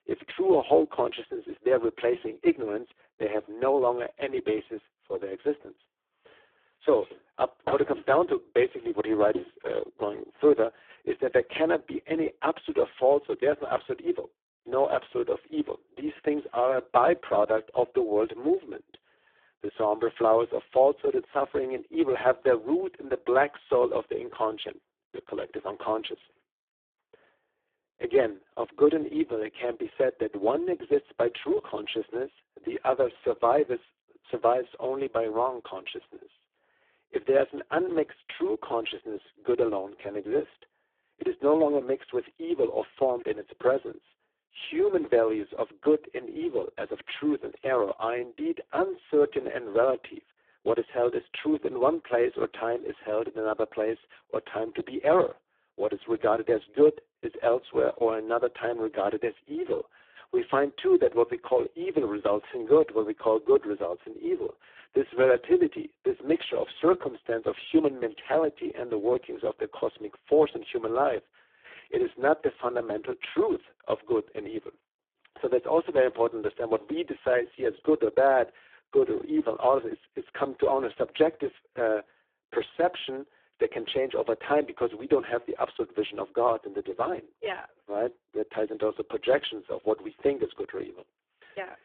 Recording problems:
phone-call audio; poor line
thin; very; fading below 300 Hz

